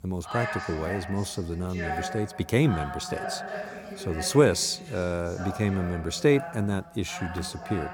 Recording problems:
voice in the background; loud; throughout; 9 dB below the speech

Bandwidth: 18.5 kHz